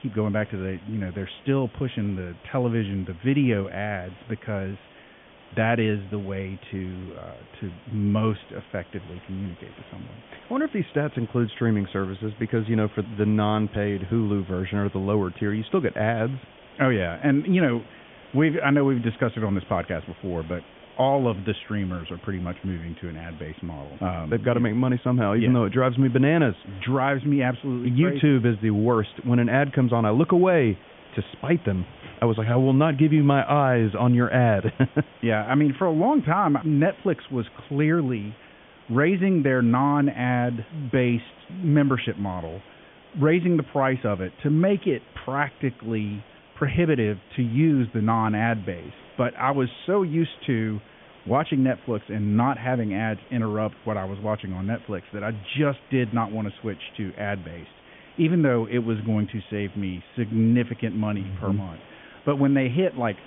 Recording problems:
high frequencies cut off; severe; nothing above 3.5 kHz
hiss; faint; throughout; 25 dB below the speech

